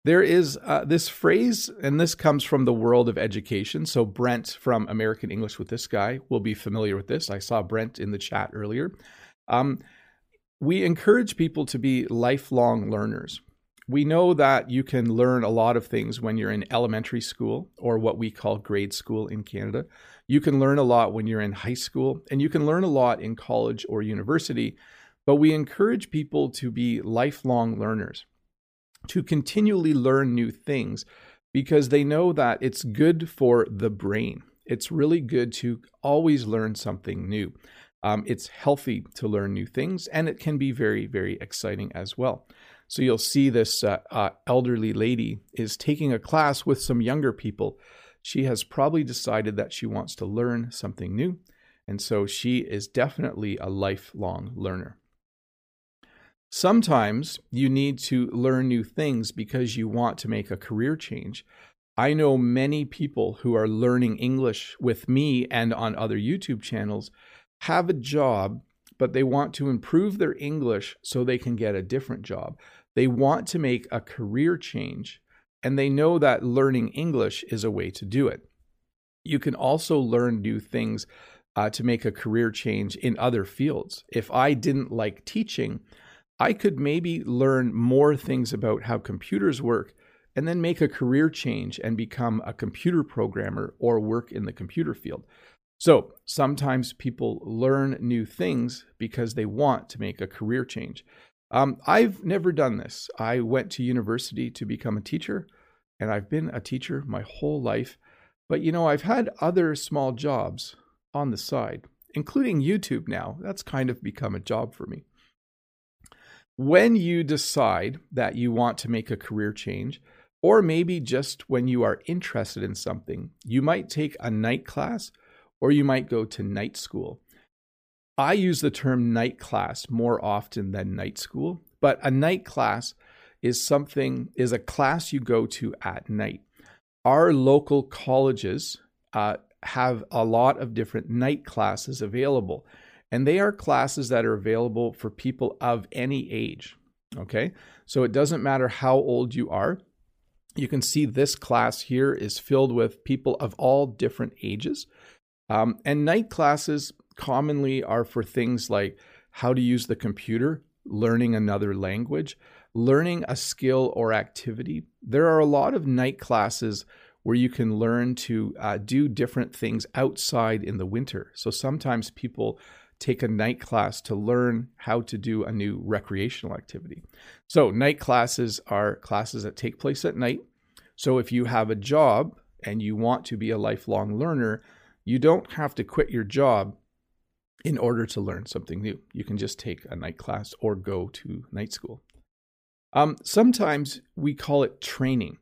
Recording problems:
none

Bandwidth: 15 kHz